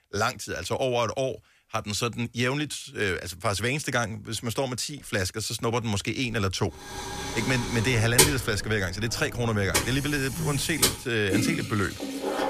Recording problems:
household noises; very loud; from 7 s on; as loud as the speech

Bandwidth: 14.5 kHz